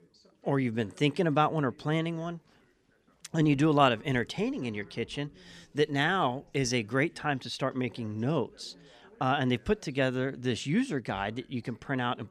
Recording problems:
background chatter; faint; throughout; 2 voices, 30 dB below the speech

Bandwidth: 14.5 kHz